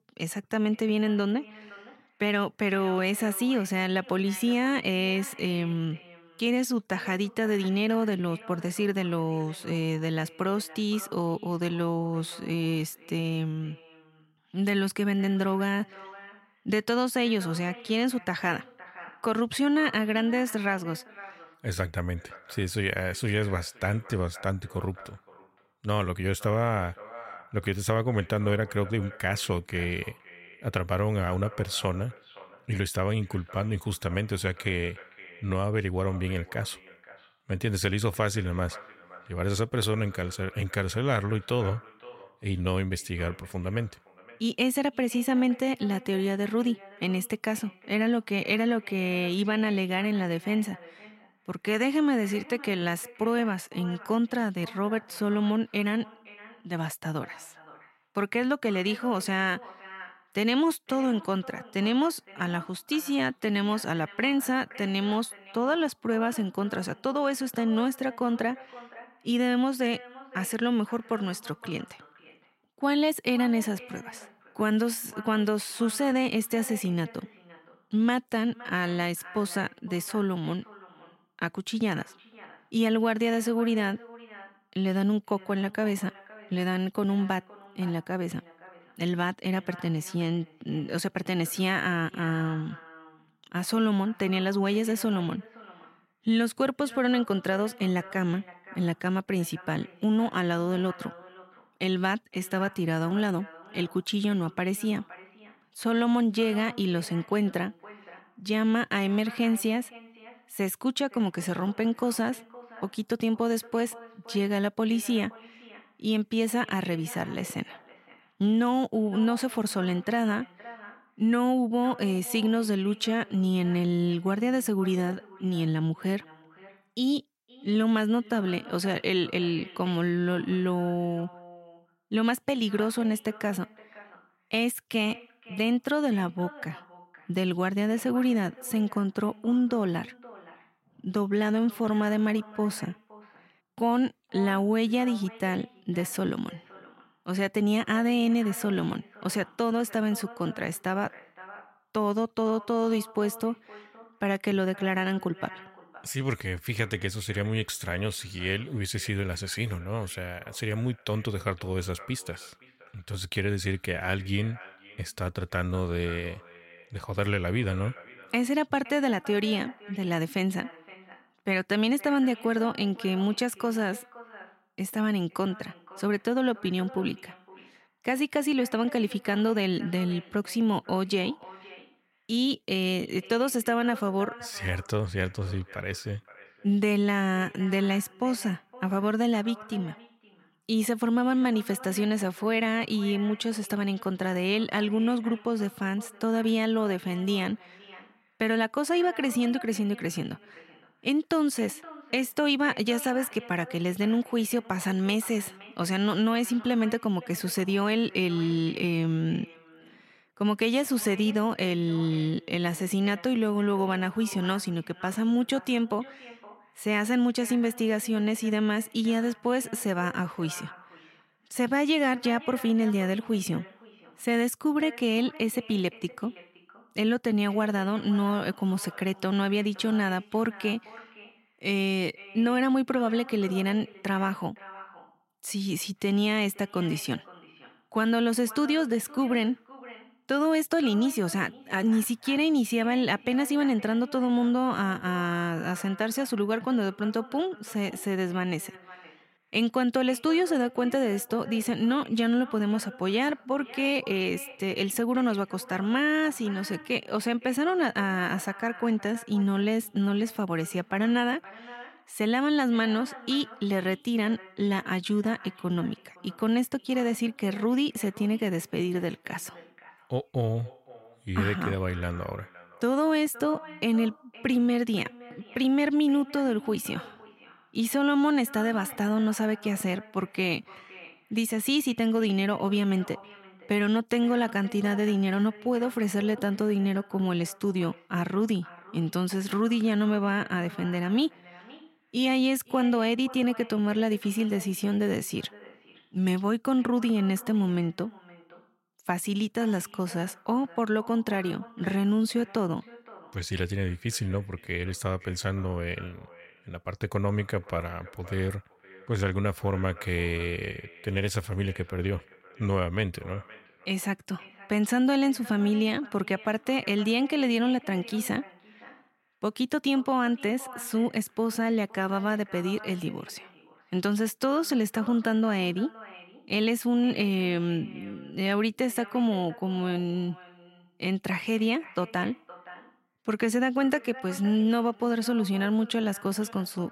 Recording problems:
echo of what is said; faint; throughout; 520 ms later, 20 dB below the speech

